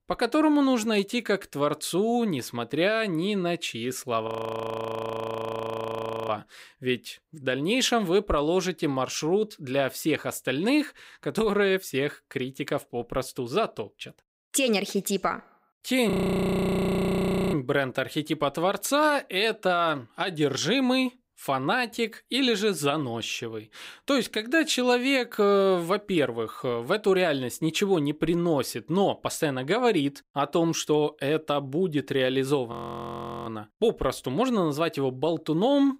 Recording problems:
audio freezing; at 4.5 s for 2 s, at 16 s for 1.5 s and at 33 s for 0.5 s

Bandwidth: 15.5 kHz